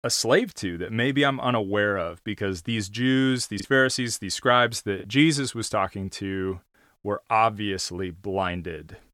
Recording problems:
choppy; occasionally; 1% of the speech affected

